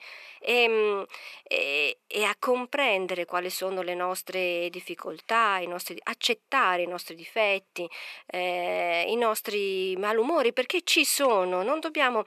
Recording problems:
thin; somewhat; fading below 450 Hz

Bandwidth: 14 kHz